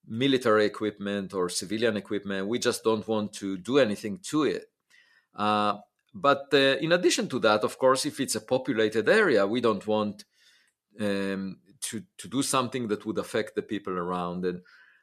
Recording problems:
none

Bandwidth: 14 kHz